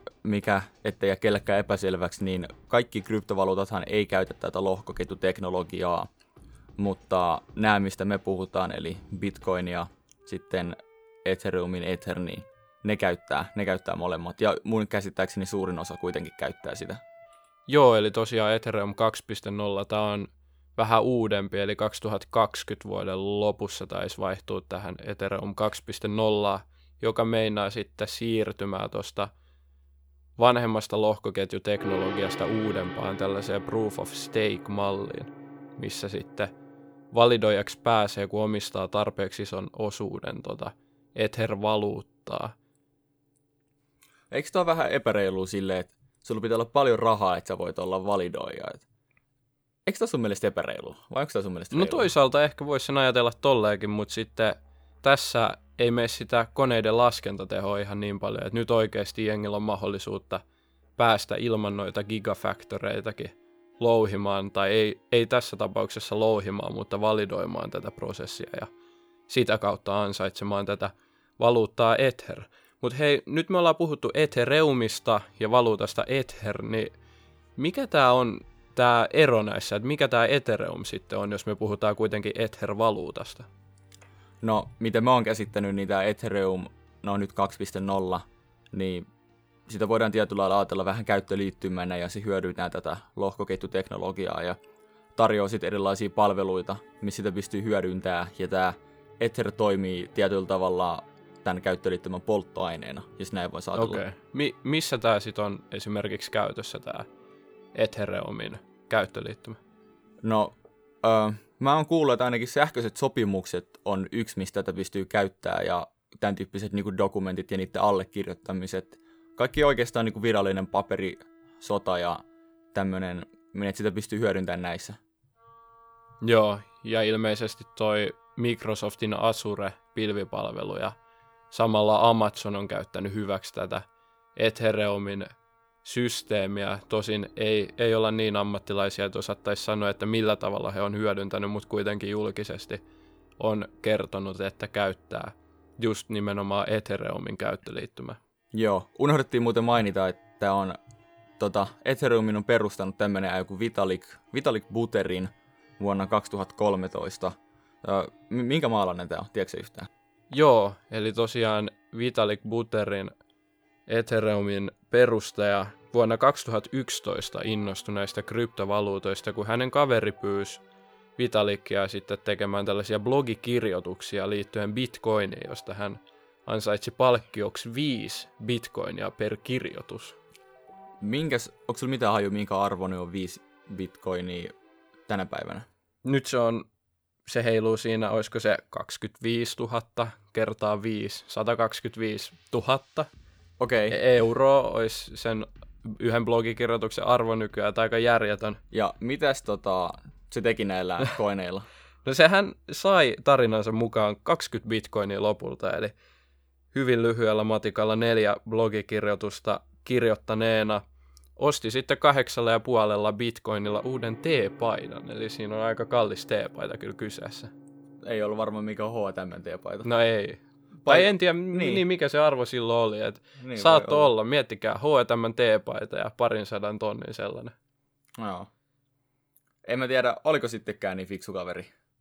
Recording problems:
background music; faint; throughout; 25 dB below the speech

